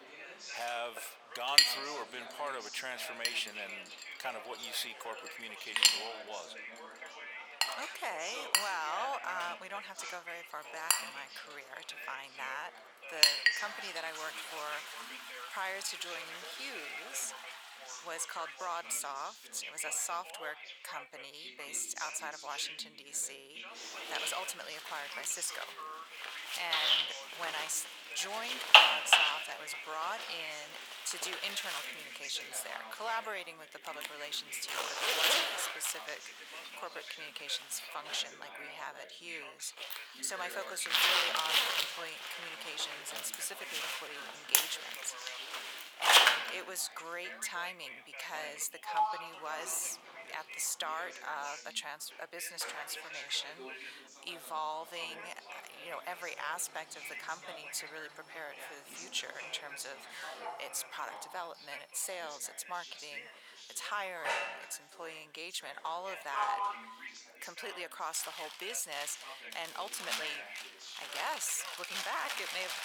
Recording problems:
thin; very; fading below 900 Hz
household noises; very loud; throughout; 9 dB above the speech
background chatter; loud; throughout; 2 voices, 7 dB below the speech

